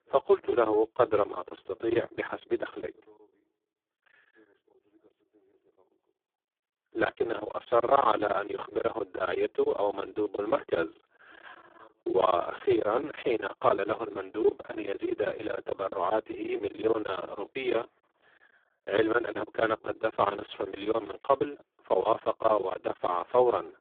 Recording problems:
phone-call audio; poor line
choppy; very; 14% of the speech affected

